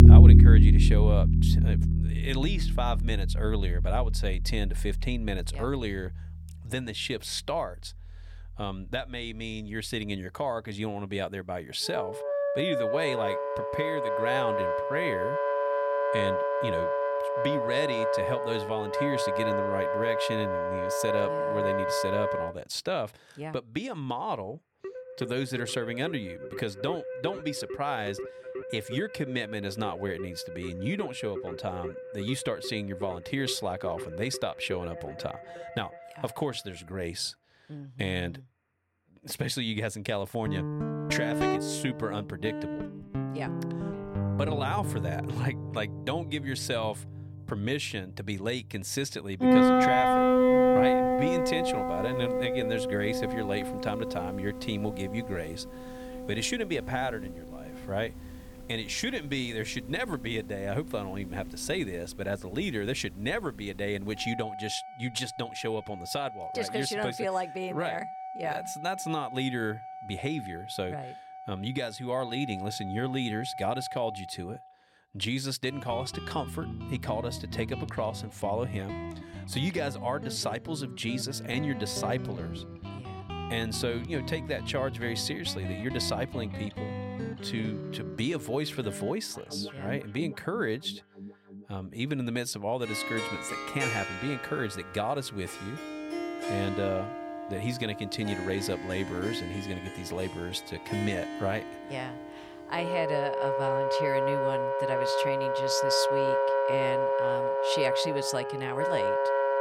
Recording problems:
background music; very loud; throughout; 4 dB above the speech

